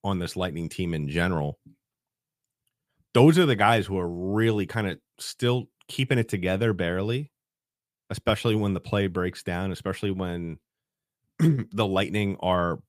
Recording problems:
none

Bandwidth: 15 kHz